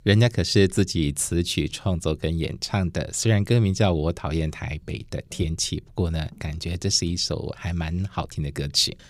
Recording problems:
none

